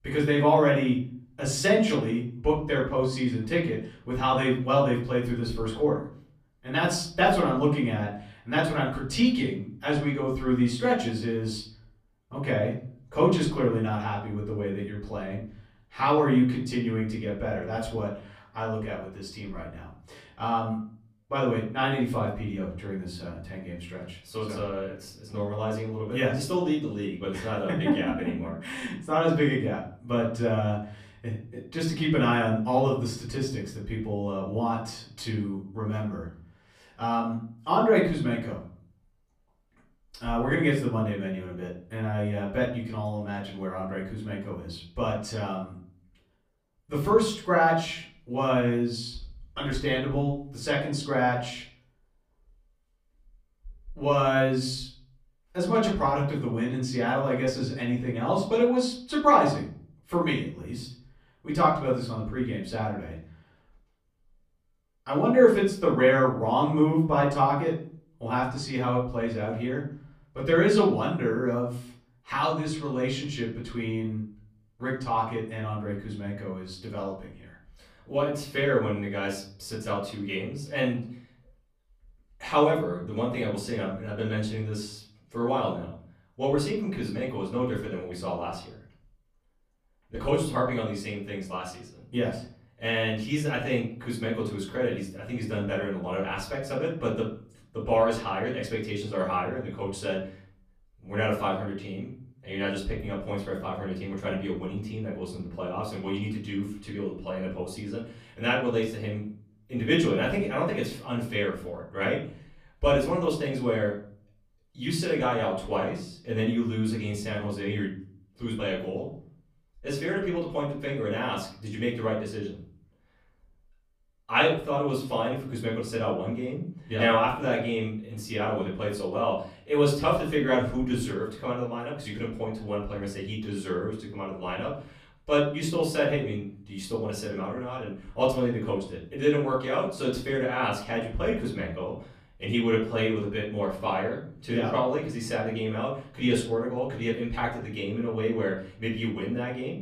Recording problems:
off-mic speech; far
room echo; slight; dies away in 0.6 s

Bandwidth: 15 kHz